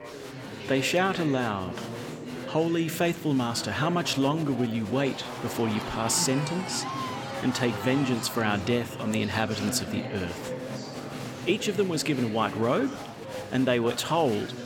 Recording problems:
chatter from many people; loud; throughout; 9 dB below the speech

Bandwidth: 17 kHz